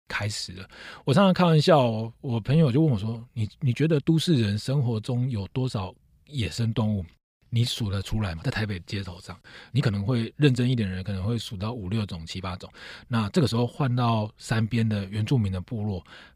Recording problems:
uneven, jittery; strongly; from 1 to 15 s

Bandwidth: 15 kHz